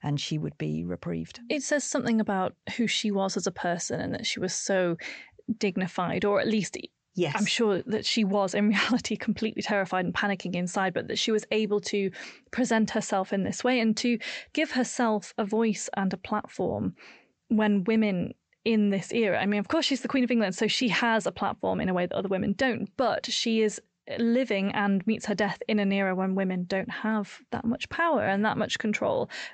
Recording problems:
high frequencies cut off; noticeable; nothing above 8 kHz

